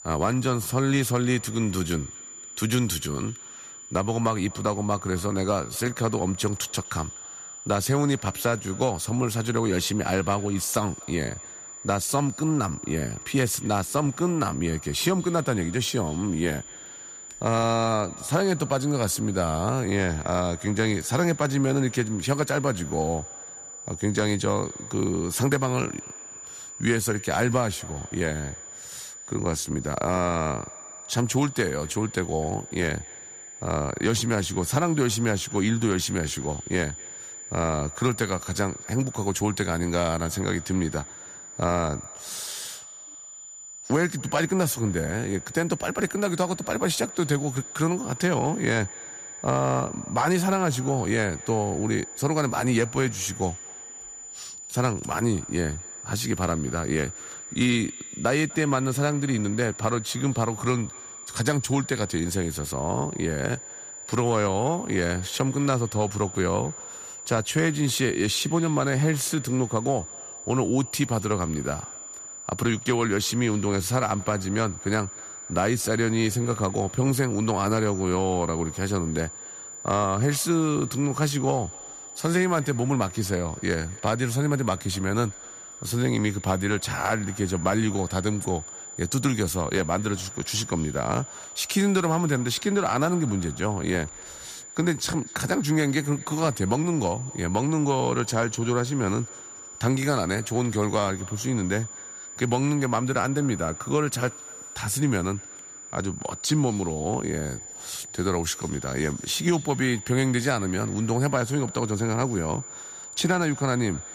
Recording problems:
echo of what is said; faint; throughout; 250 ms later, 25 dB below the speech
high-pitched whine; noticeable; throughout; 7 kHz, 10 dB below the speech

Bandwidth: 14.5 kHz